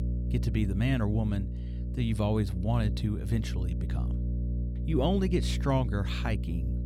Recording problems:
electrical hum; noticeable; throughout; 60 Hz, 10 dB below the speech

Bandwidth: 16.5 kHz